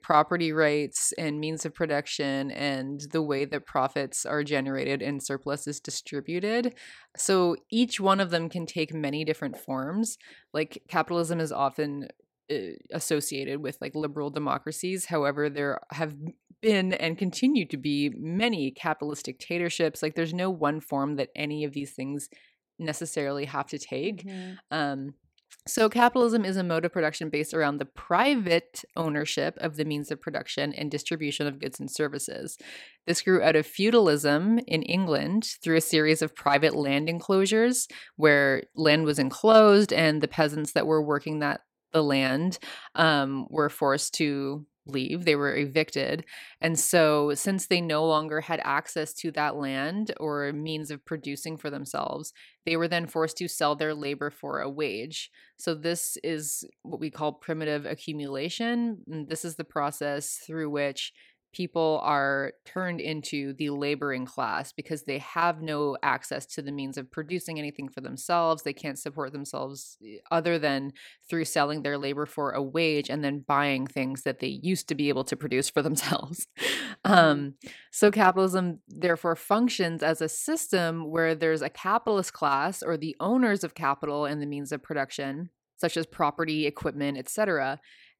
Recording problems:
none

